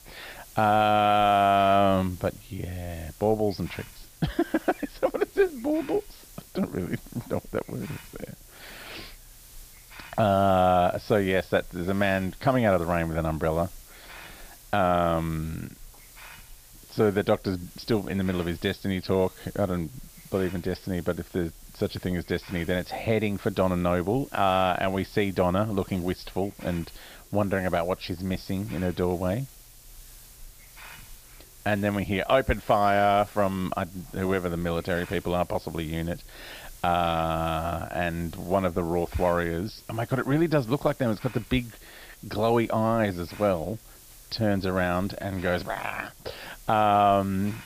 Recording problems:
high frequencies cut off; noticeable; nothing above 5.5 kHz
hiss; faint; throughout; 20 dB below the speech

